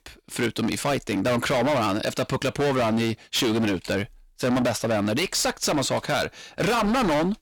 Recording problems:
distortion; heavy; 25% of the sound clipped

